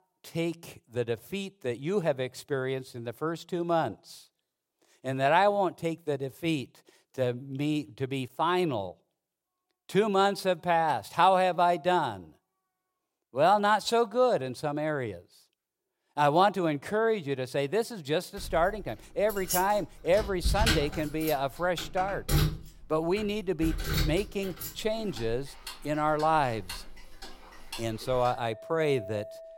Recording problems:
household noises; loud; from 19 s on; 7 dB below the speech

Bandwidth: 16.5 kHz